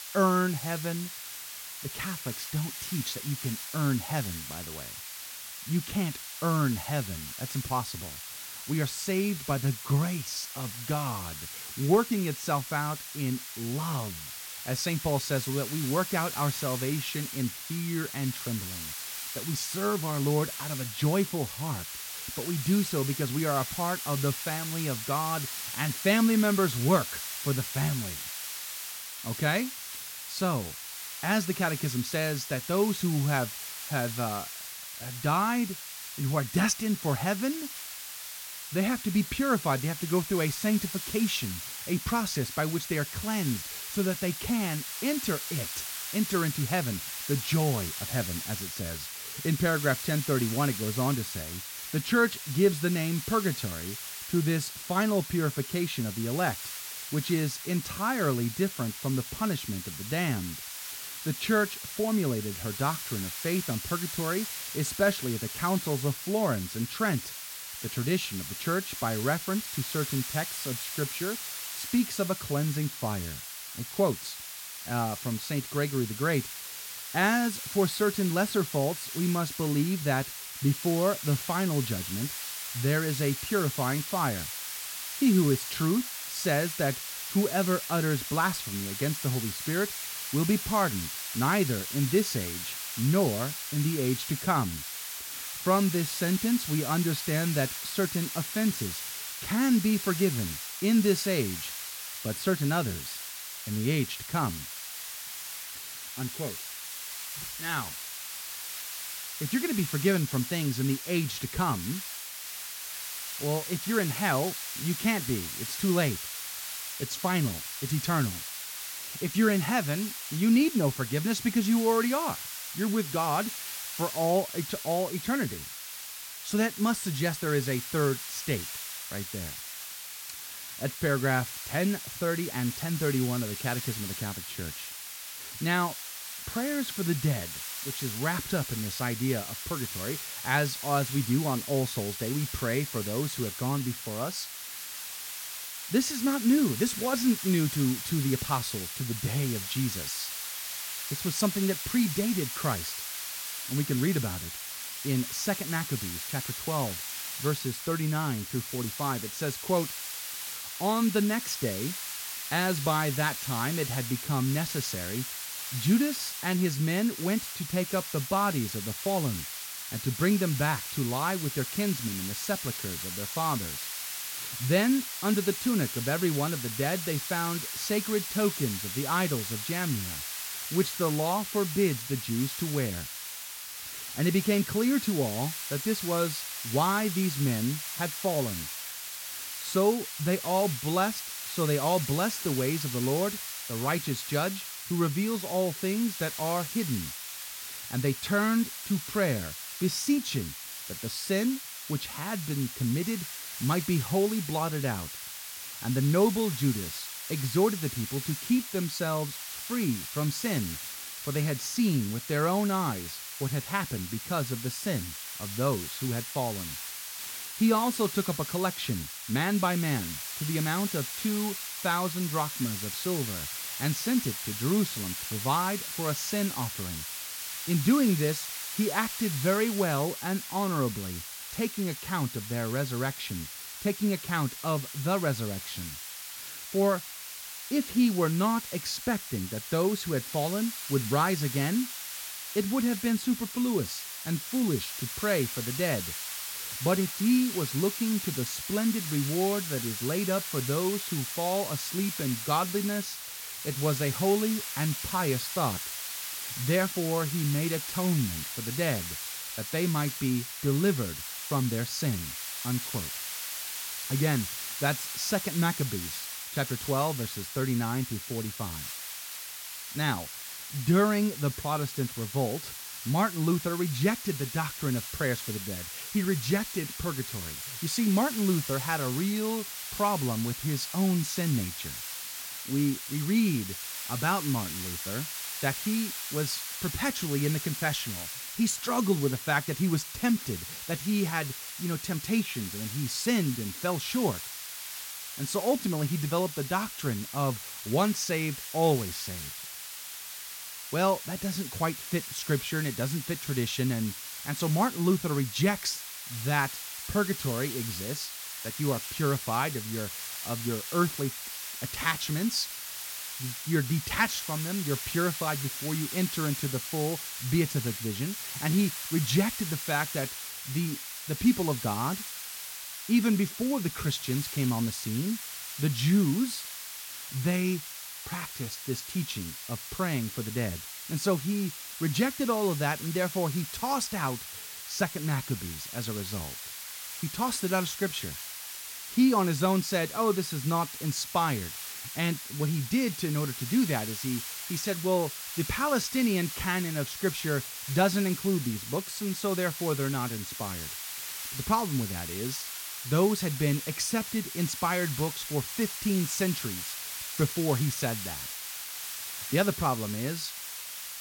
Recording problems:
hiss; loud; throughout; 6 dB below the speech

